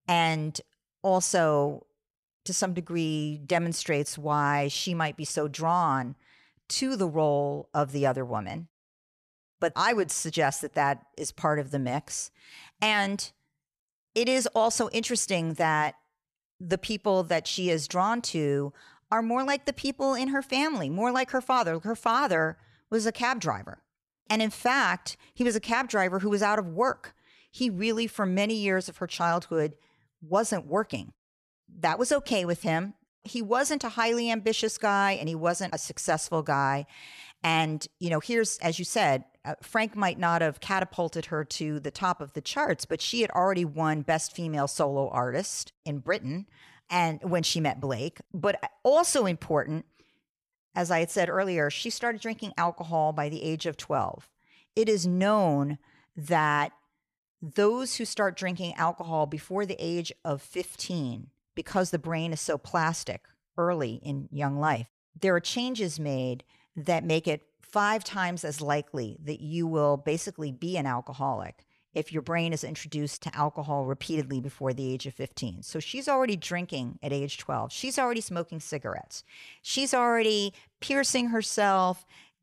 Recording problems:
none

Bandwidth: 14.5 kHz